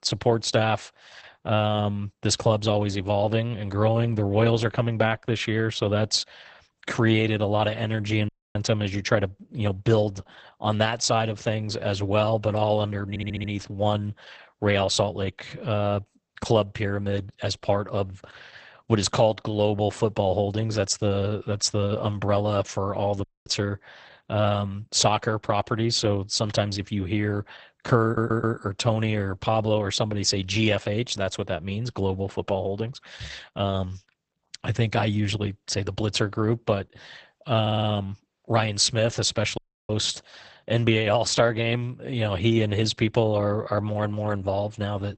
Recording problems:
garbled, watery; badly; nothing above 8 kHz
audio cutting out; at 8.5 s, at 23 s and at 40 s
audio stuttering; at 13 s, at 28 s and at 38 s

